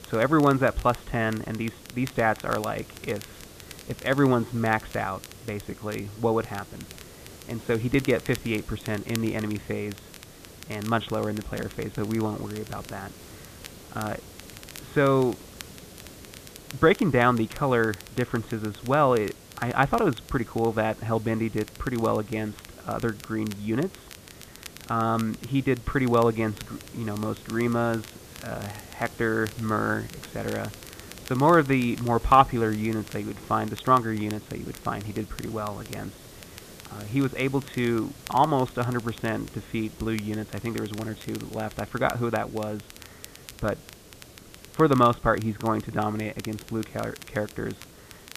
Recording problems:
high frequencies cut off; severe; nothing above 4 kHz
hiss; noticeable; throughout; 20 dB below the speech
crackle, like an old record; noticeable; 20 dB below the speech

